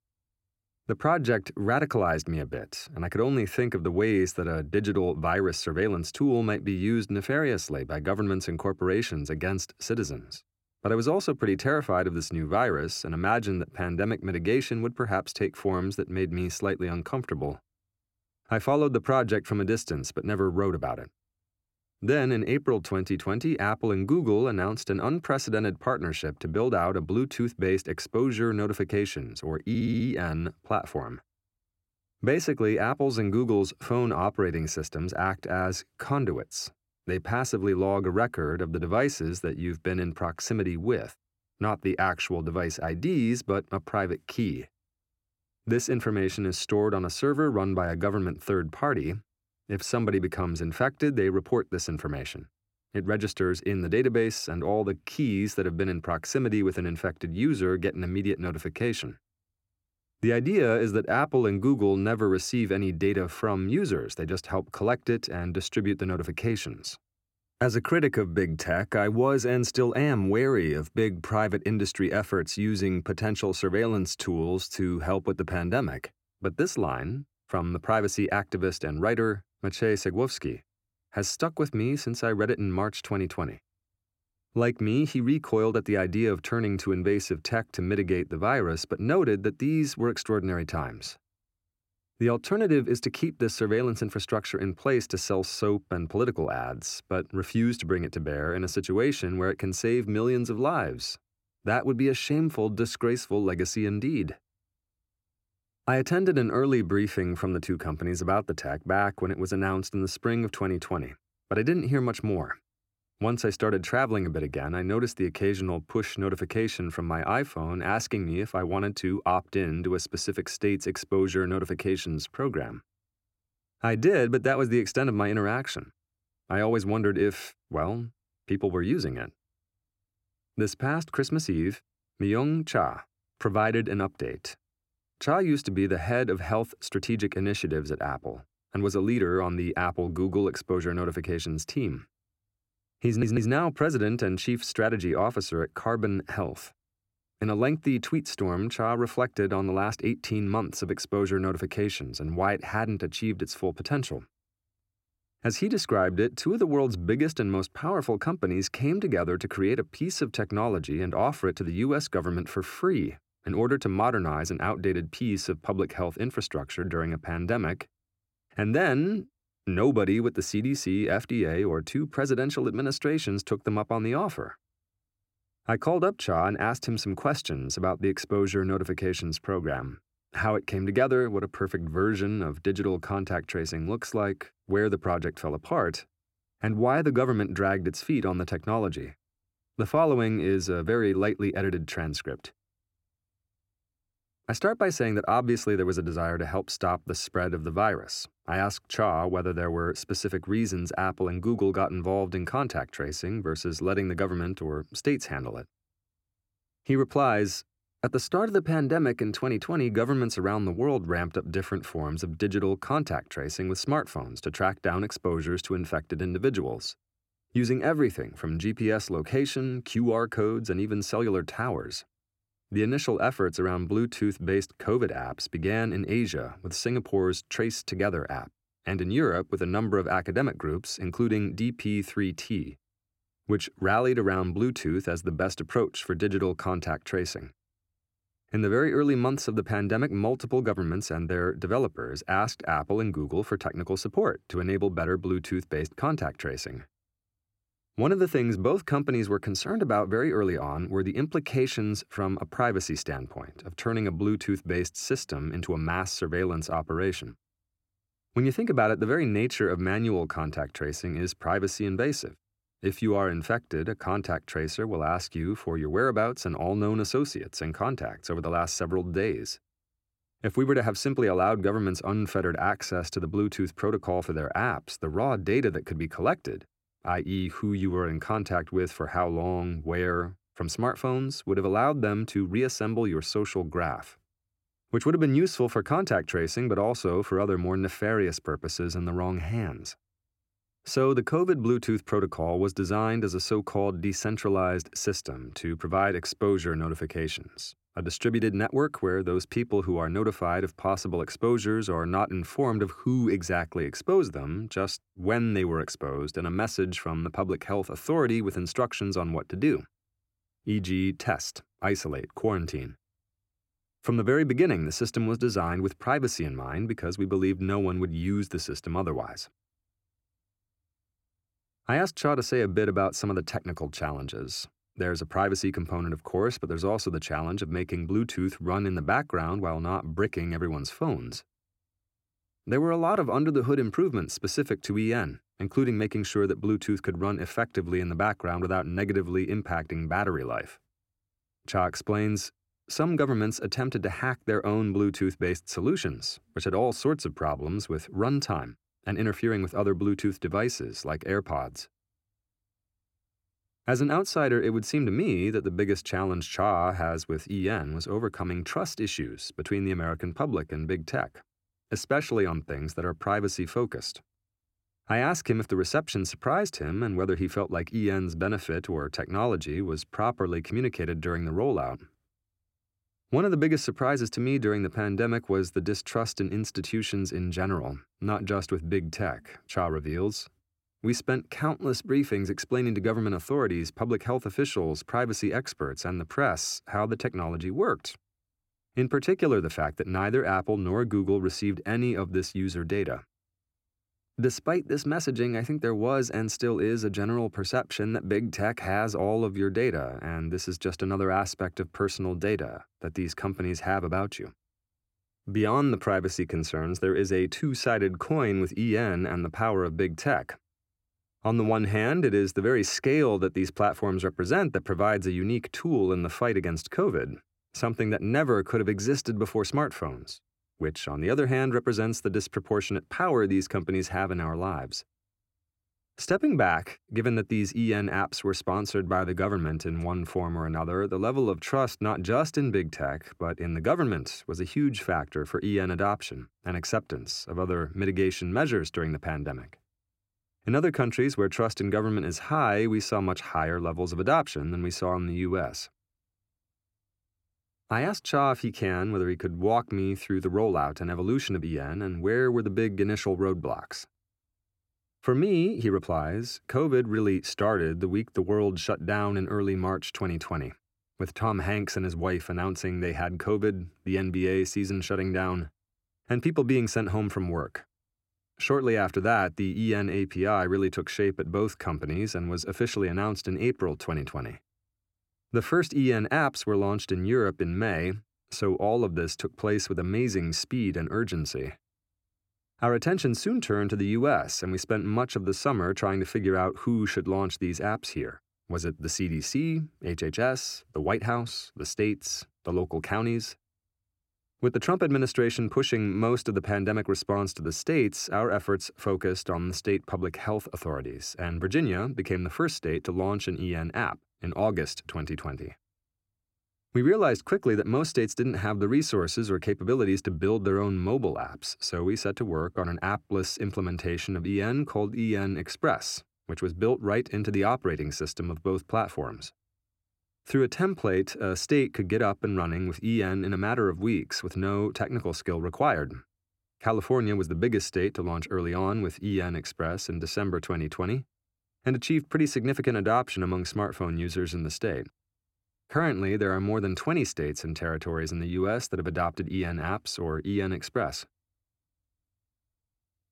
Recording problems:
audio stuttering; at 30 s and at 2:23

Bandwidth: 16.5 kHz